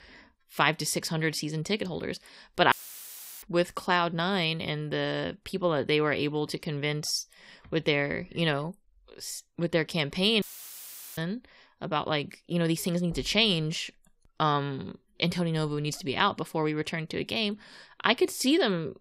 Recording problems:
audio cutting out; filled with static; at 2.5 s for 0.5 s and at 10 s for 1 s

